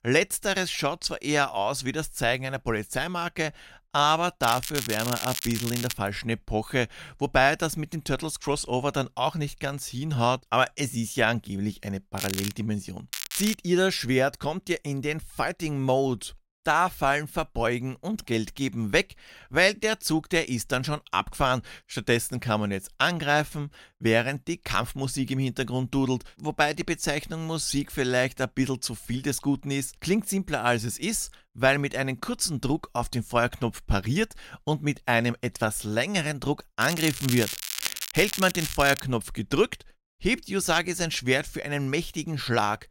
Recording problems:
crackling; loud; 4 times, first at 4.5 s; 5 dB below the speech

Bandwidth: 16 kHz